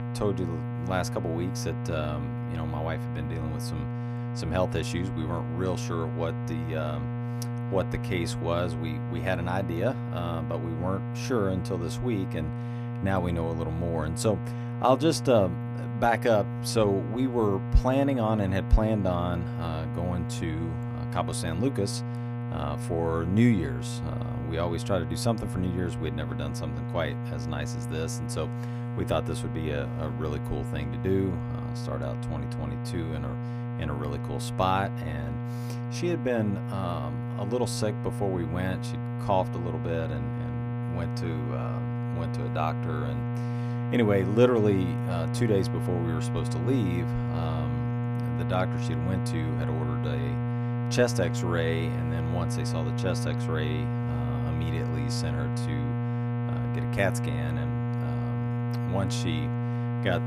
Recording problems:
electrical hum; loud; throughout; 60 Hz, 7 dB below the speech

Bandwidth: 15 kHz